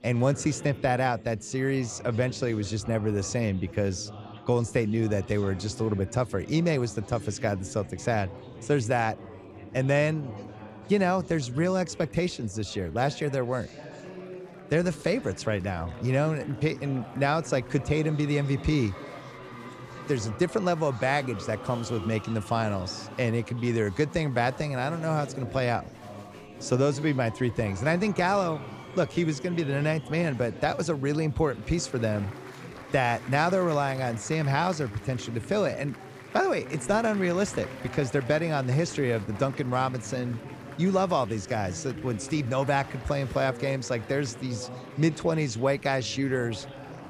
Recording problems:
chatter from many people; noticeable; throughout; 15 dB below the speech

